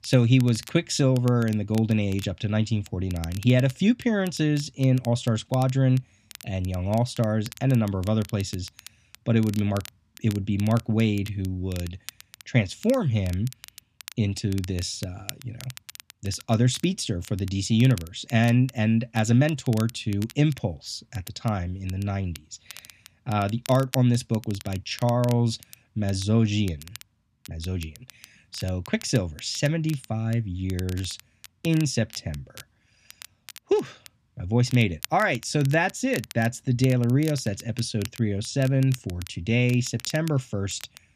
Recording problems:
crackle, like an old record; noticeable; 20 dB below the speech

